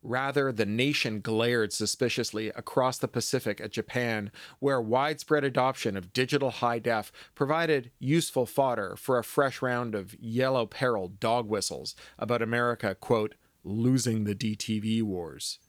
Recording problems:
none

